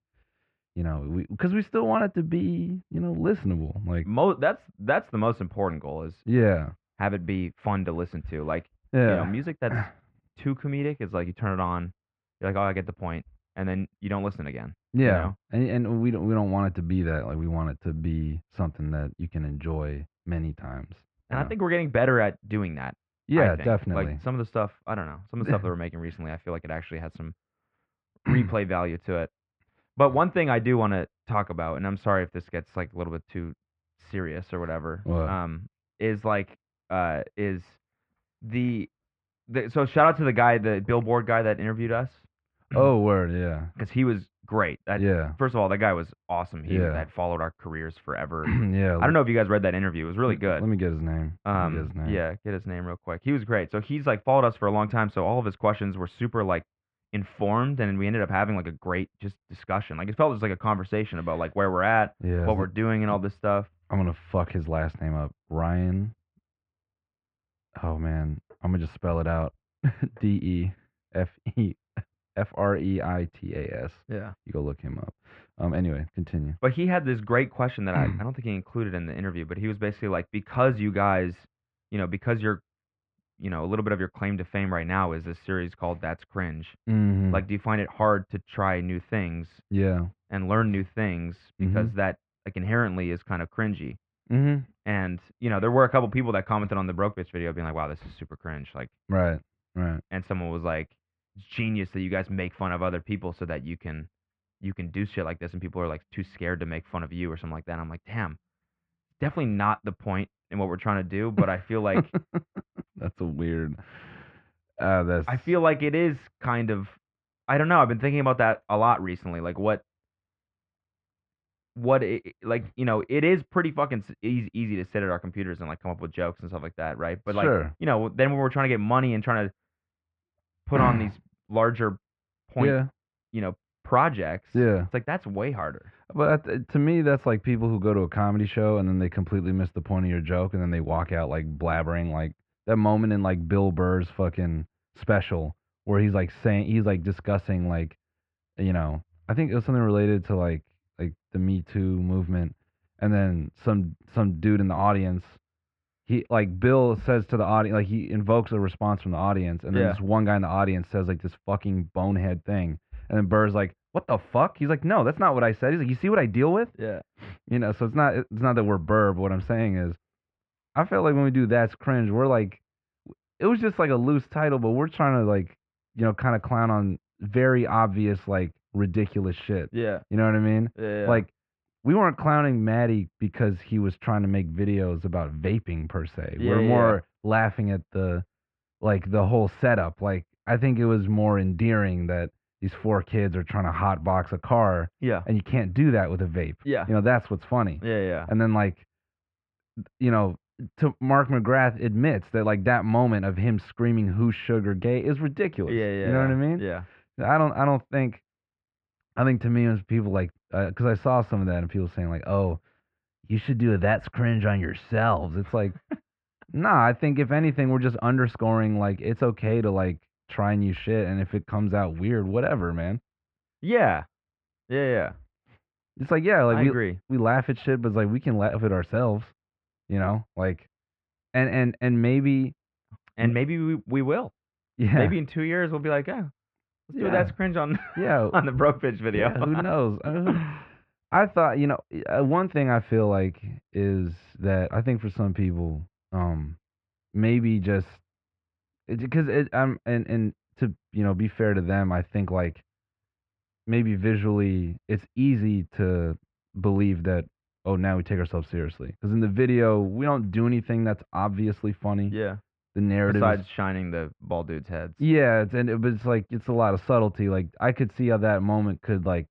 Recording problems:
muffled; very; fading above 2.5 kHz

